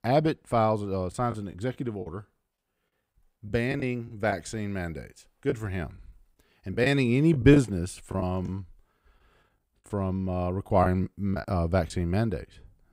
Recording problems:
choppy; very; from 1 to 4.5 s, from 5.5 to 8.5 s and from 11 to 12 s; 8% of the speech affected

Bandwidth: 15.5 kHz